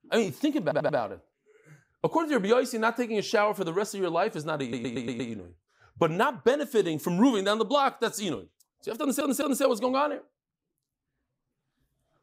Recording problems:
audio stuttering; at 0.5 s, at 4.5 s and at 9 s

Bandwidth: 15.5 kHz